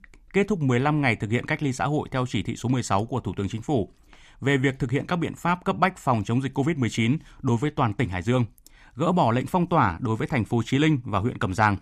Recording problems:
none

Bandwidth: 15 kHz